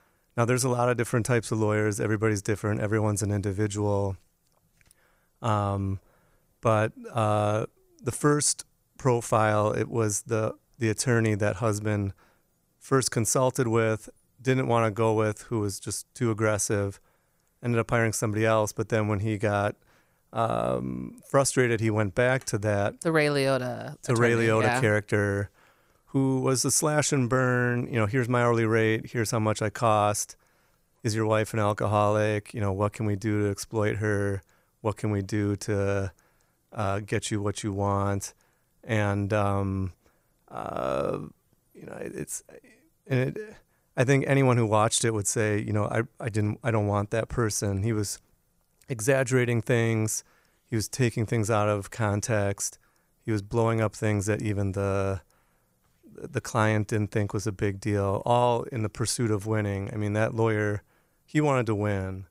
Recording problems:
none

